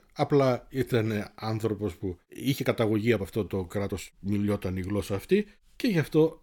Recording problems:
uneven, jittery; strongly; from 0.5 to 5.5 s

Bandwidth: 18 kHz